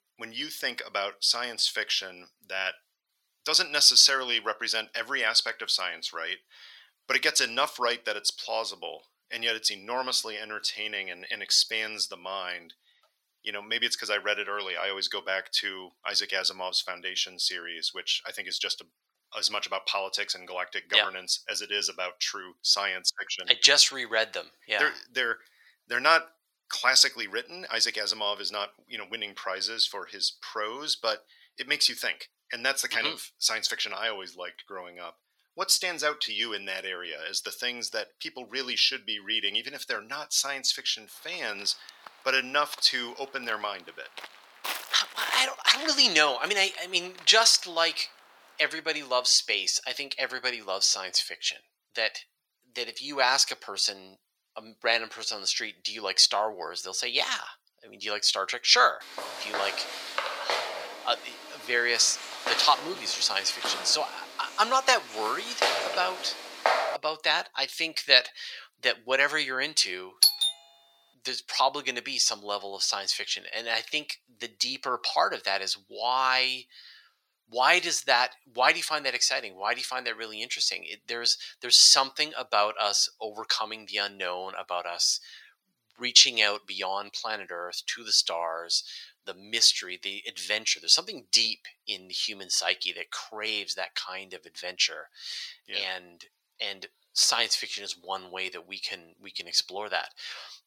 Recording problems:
thin; very; fading below 950 Hz
footsteps; noticeable; from 41 to 48 s; peak 8 dB below the speech
footsteps; loud; from 59 s to 1:07; peak level with the speech
doorbell; loud; at 1:10; peak 6 dB above the speech

